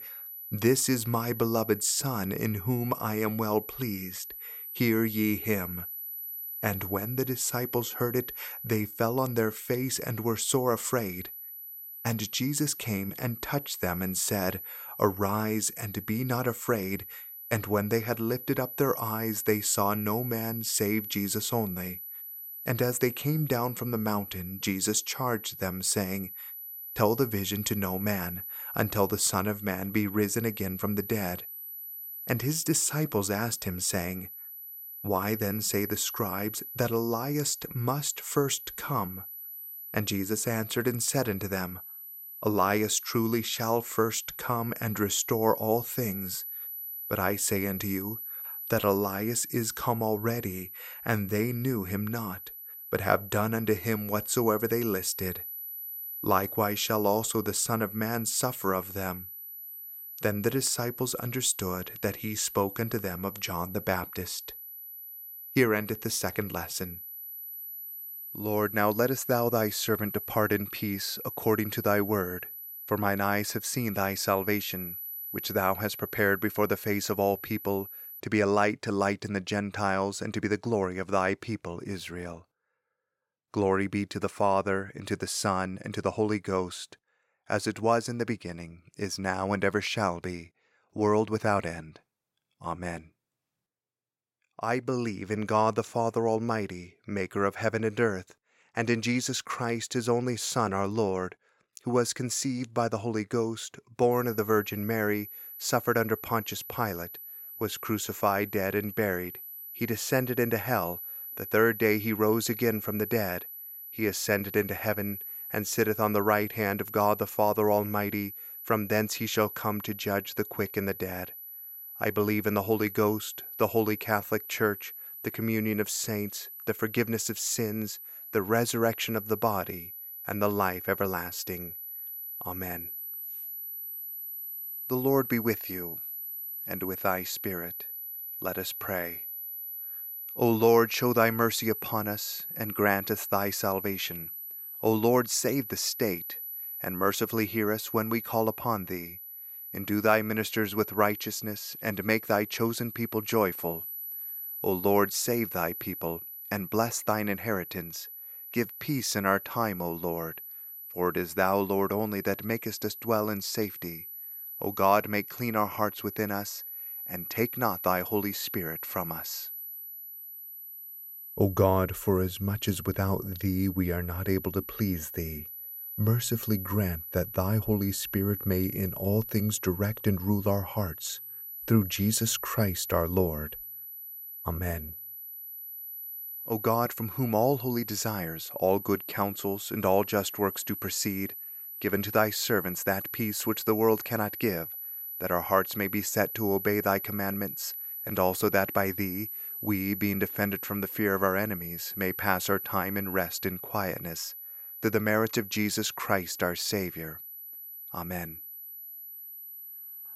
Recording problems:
high-pitched whine; loud; until 1:18 and from 1:44 on; 12 kHz, 8 dB below the speech

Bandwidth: 16.5 kHz